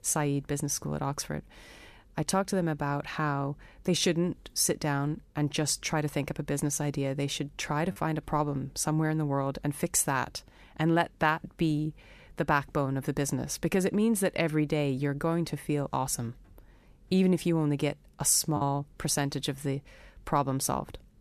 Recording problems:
choppy; occasionally; at 8 s and at 19 s; 2% of the speech affected

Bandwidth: 14.5 kHz